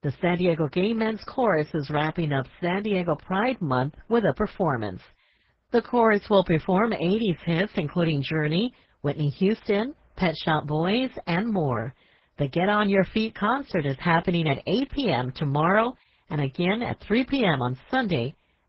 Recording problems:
garbled, watery; badly

